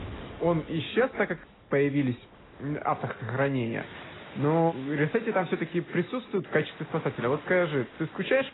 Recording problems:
garbled, watery; badly; nothing above 4 kHz
rain or running water; noticeable; throughout; 20 dB below the speech

